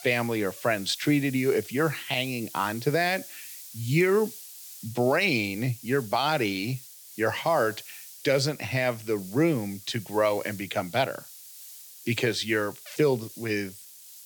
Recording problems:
hiss; noticeable; throughout; 15 dB below the speech

